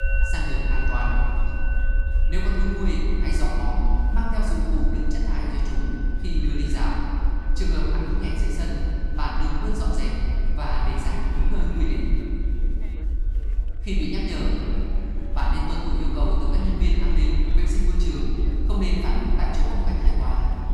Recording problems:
room echo; strong; dies away in 2.6 s
off-mic speech; far
background music; loud; throughout; 10 dB below the speech
chatter from many people; noticeable; throughout; 20 dB below the speech
low rumble; noticeable; throughout; 15 dB below the speech

